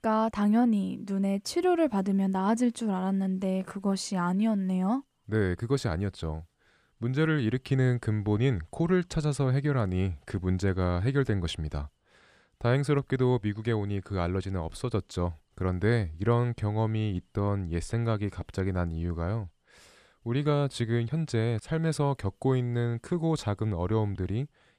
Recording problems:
none

